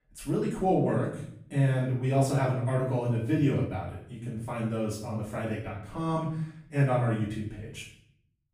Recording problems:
off-mic speech; far
room echo; noticeable; dies away in 0.6 s

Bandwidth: 15.5 kHz